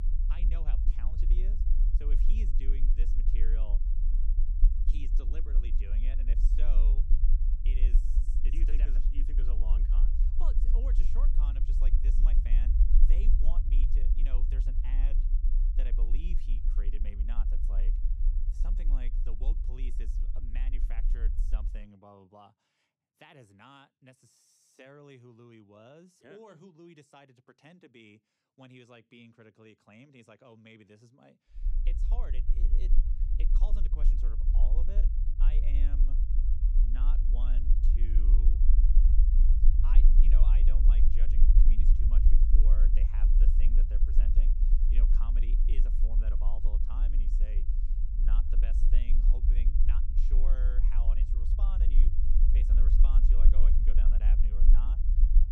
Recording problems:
low rumble; loud; until 22 s and from 32 s on; 1 dB below the speech

